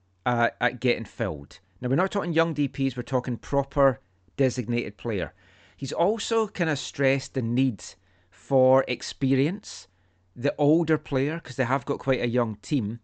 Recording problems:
high frequencies cut off; noticeable; nothing above 8 kHz

